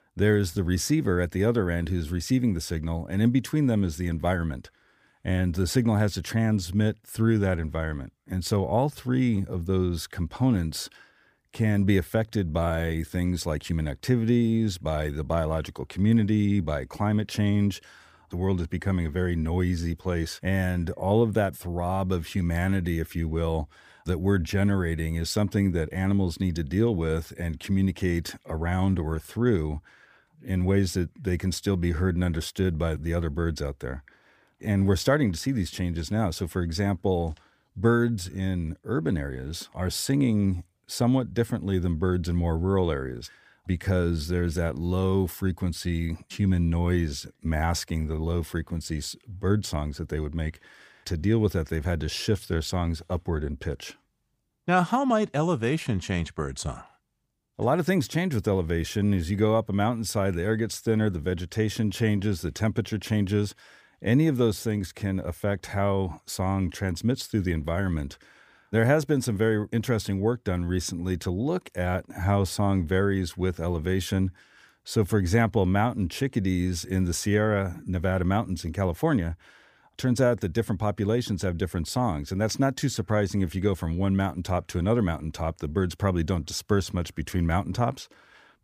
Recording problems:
none

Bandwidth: 15 kHz